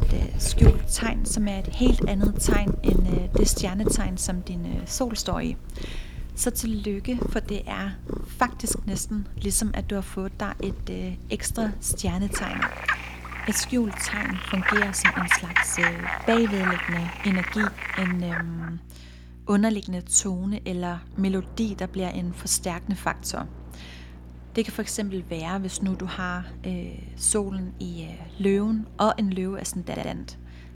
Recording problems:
animal sounds; very loud; until 18 s; as loud as the speech
electrical hum; faint; throughout; 60 Hz, 25 dB below the speech
rain or running water; faint; from 10 s on; 25 dB below the speech
audio stuttering; at 30 s

